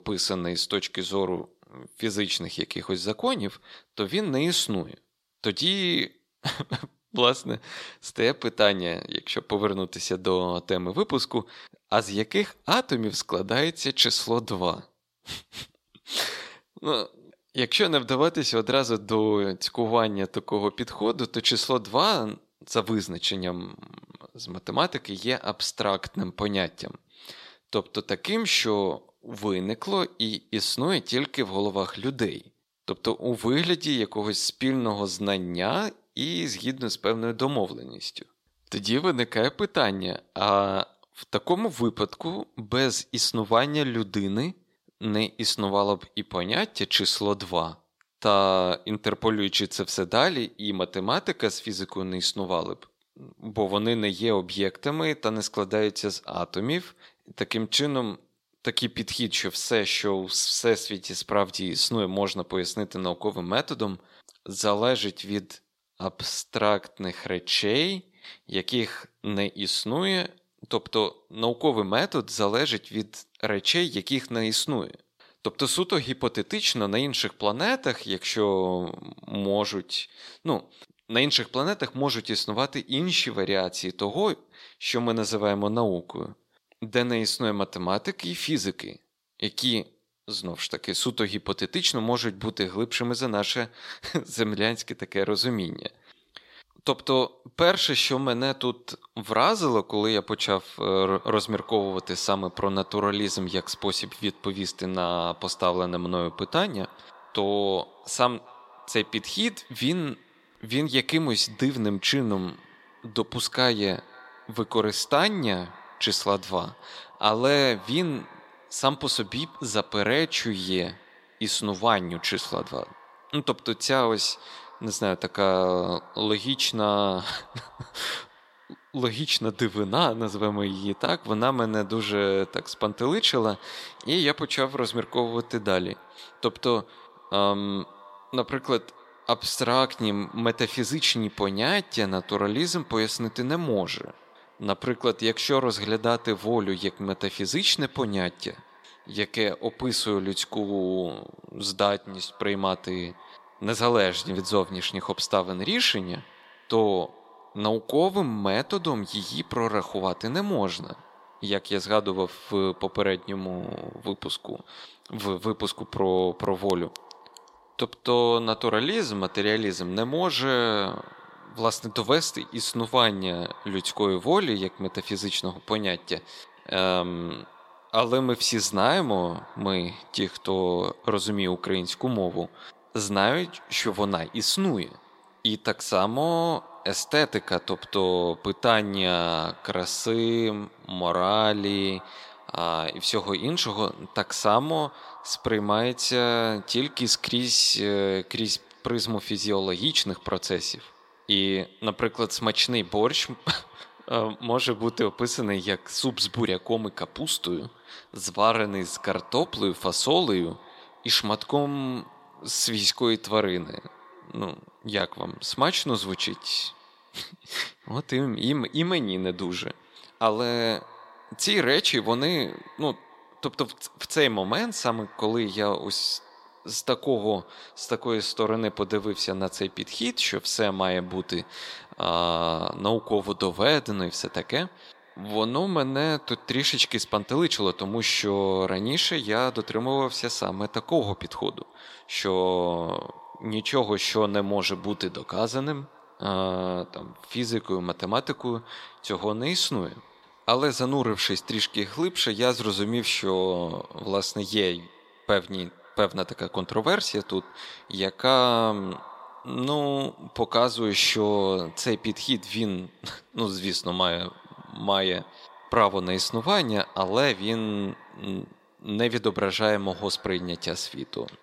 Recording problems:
echo of what is said; faint; from 1:41 on; 260 ms later, 25 dB below the speech
thin; very slightly; fading below 450 Hz

